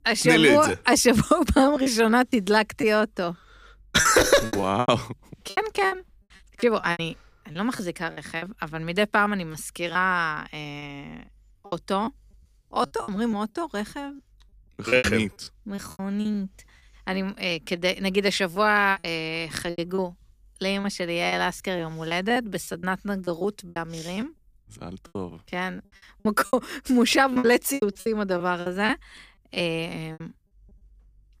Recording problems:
choppy; very; 12% of the speech affected

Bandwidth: 15 kHz